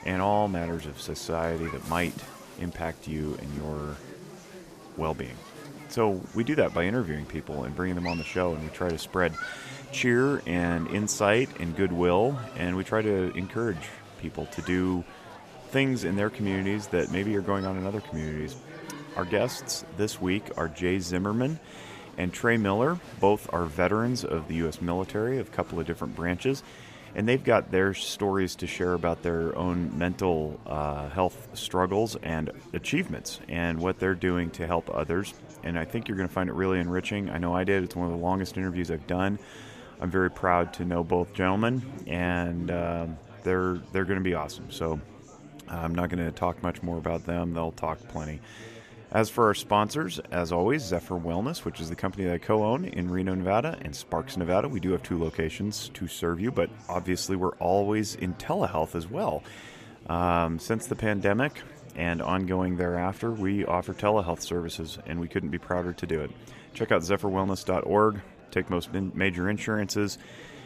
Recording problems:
murmuring crowd; noticeable; throughout; 15 dB below the speech

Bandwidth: 14.5 kHz